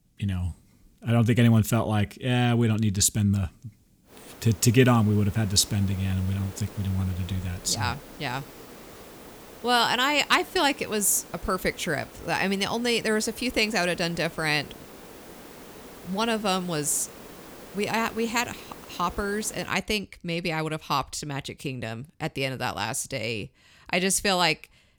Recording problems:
hiss; noticeable; from 4 to 20 s; 20 dB below the speech

